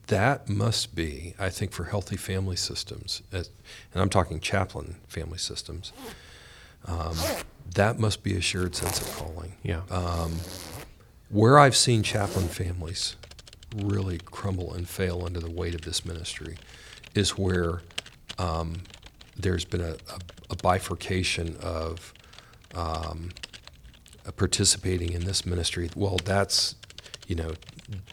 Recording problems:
household noises; noticeable; from 6.5 s on; 15 dB below the speech

